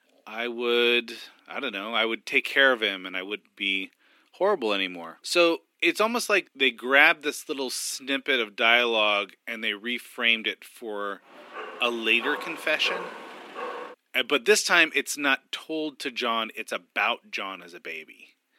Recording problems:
thin; somewhat; fading below 250 Hz
dog barking; faint; from 11 to 14 s; peak 10 dB below the speech

